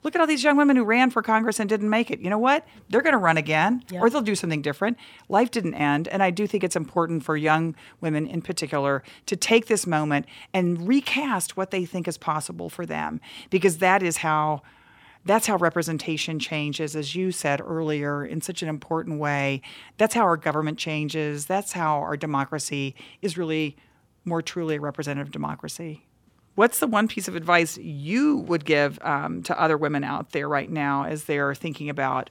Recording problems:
none

